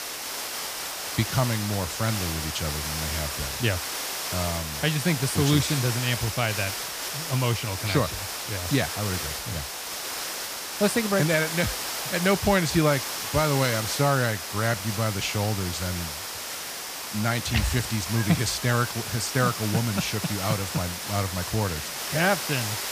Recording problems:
hiss; loud; throughout; 4 dB below the speech

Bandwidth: 15 kHz